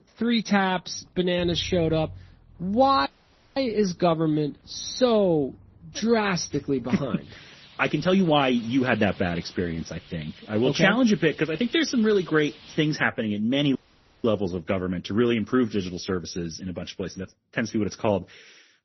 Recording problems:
garbled, watery; slightly; nothing above 6 kHz
traffic noise; faint; until 13 s; 20 dB below the speech
audio cutting out; at 3 s for 0.5 s and at 14 s

